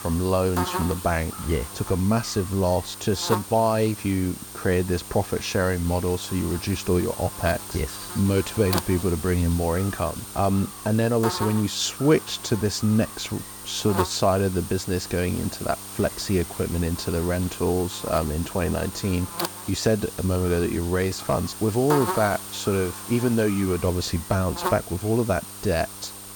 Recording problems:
electrical hum; loud; throughout; 50 Hz, 8 dB below the speech

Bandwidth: 18 kHz